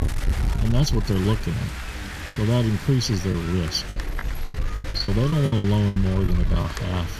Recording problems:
room echo; slight; dies away in 3 s
wind noise on the microphone; heavy; 7 dB below the speech
chatter from many people; noticeable; throughout; 20 dB below the speech
choppy; very; 8% of the speech affected

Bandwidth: 14.5 kHz